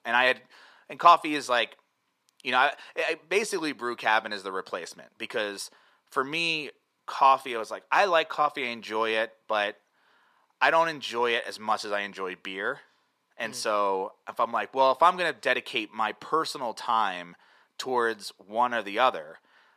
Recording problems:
thin; very; fading below 450 Hz

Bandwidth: 14.5 kHz